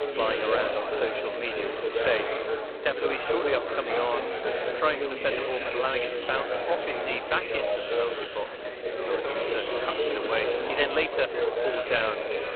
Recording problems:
phone-call audio; poor line; nothing above 4 kHz
chatter from many people; very loud; throughout; 1 dB above the speech

